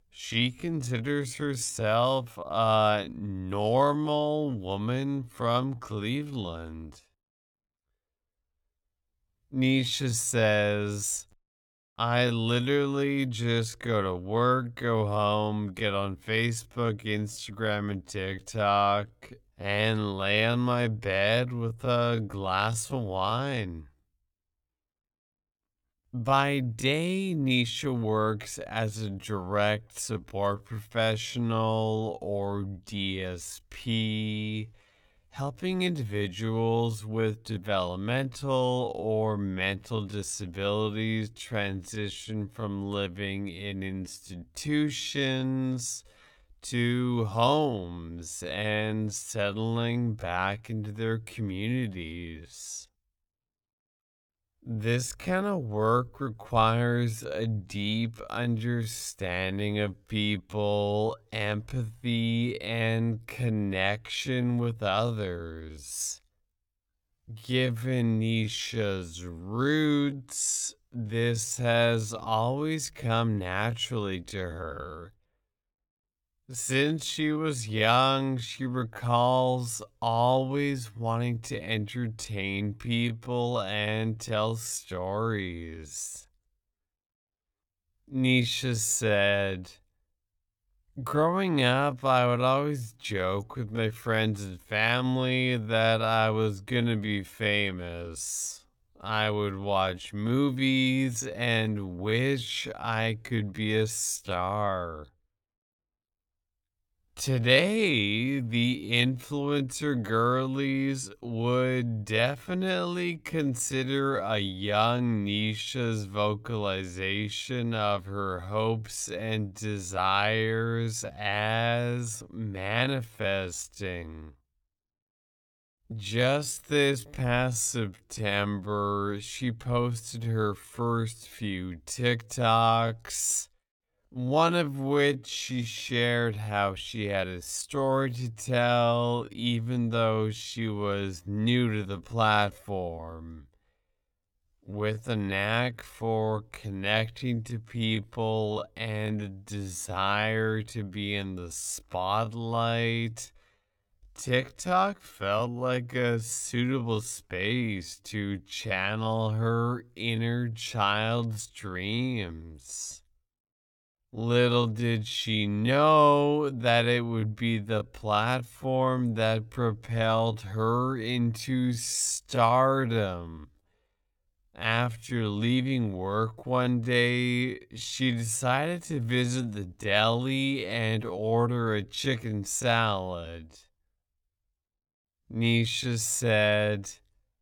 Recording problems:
wrong speed, natural pitch; too slow; 0.5 times normal speed

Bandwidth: 18.5 kHz